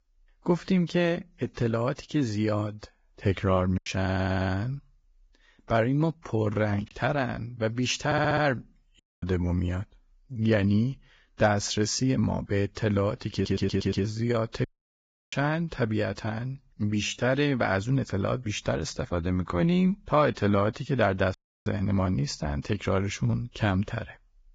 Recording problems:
garbled, watery; badly; nothing above 7.5 kHz
choppy; occasionally; from 4 to 7 s; 3% of the speech affected
audio stuttering; at 4 s, at 8 s and at 13 s
audio cutting out; at 9 s, at 15 s for 0.5 s and at 21 s

